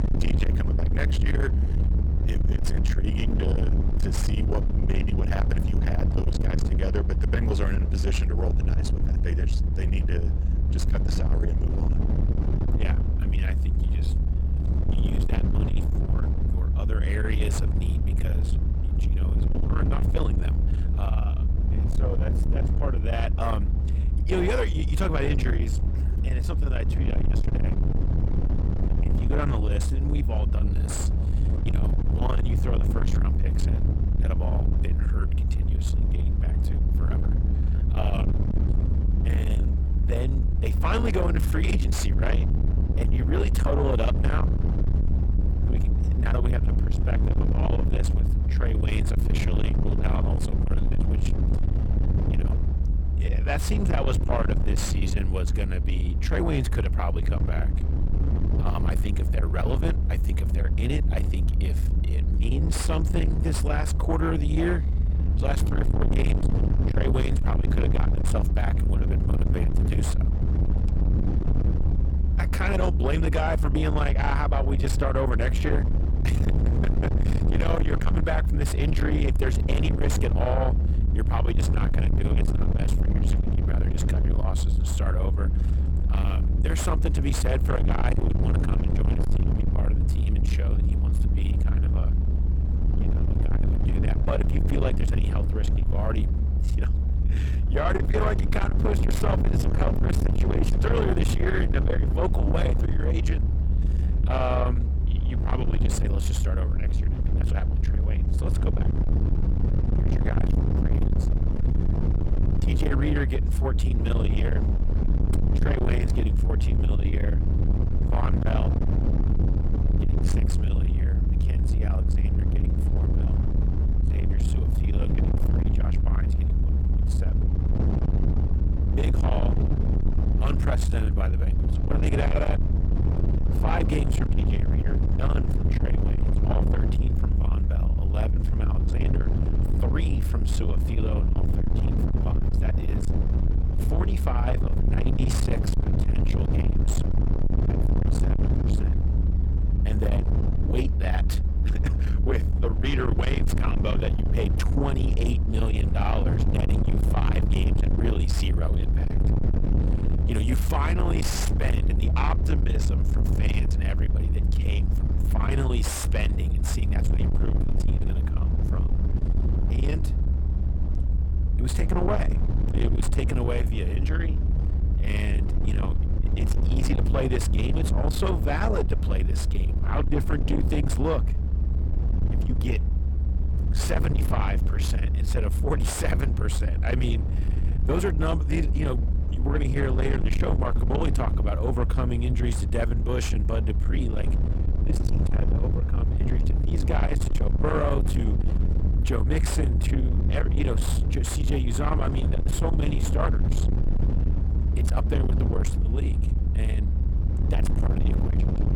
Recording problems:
distortion; heavy; 7 dB below the speech
low rumble; loud; throughout; 5 dB below the speech

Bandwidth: 18 kHz